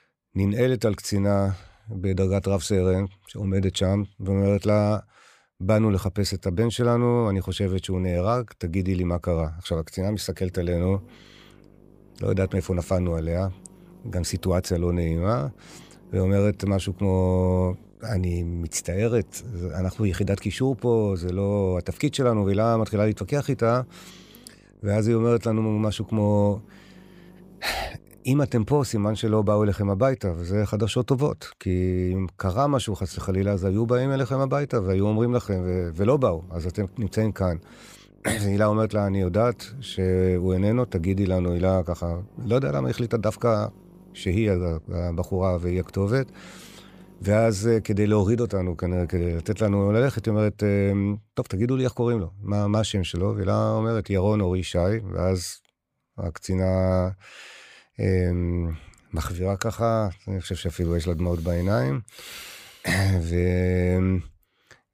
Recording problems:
electrical hum; faint; from 11 to 29 s and from 33 to 50 s; 50 Hz, 30 dB below the speech

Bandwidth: 15 kHz